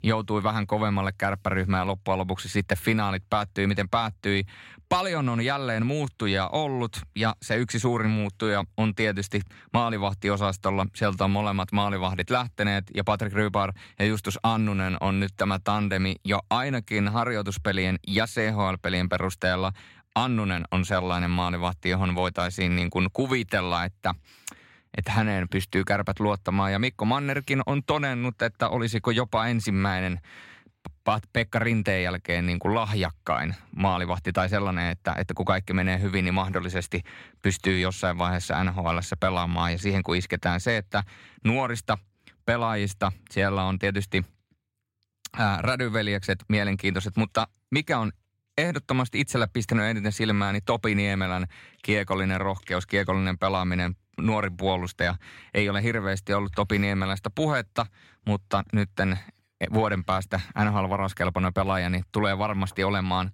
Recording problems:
none

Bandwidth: 16 kHz